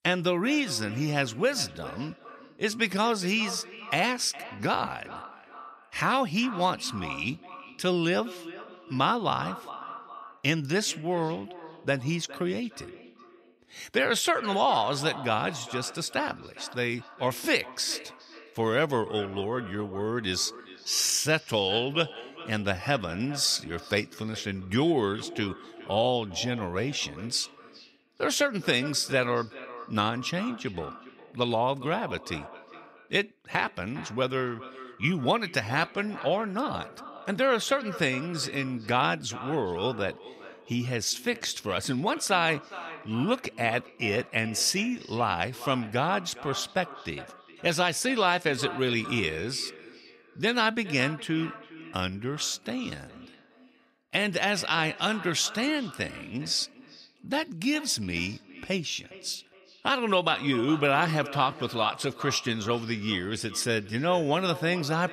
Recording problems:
echo of what is said; noticeable; throughout; 410 ms later, 15 dB below the speech

